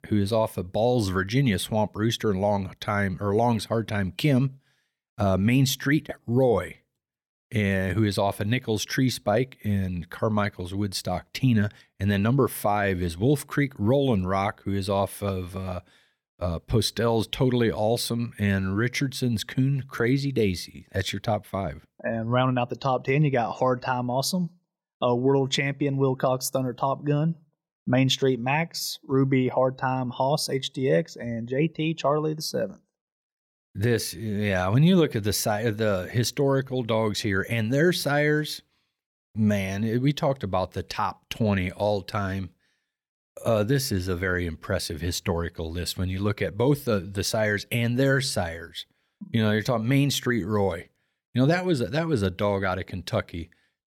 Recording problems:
none

